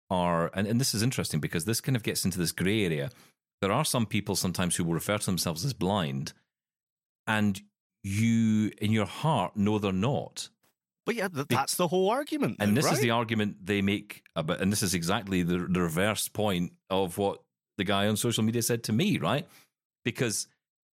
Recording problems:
none

